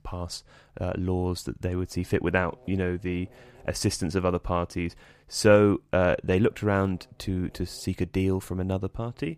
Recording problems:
electrical hum; faint; from 1.5 to 4.5 s and from 6.5 s on; 50 Hz, 30 dB below the speech

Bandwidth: 15 kHz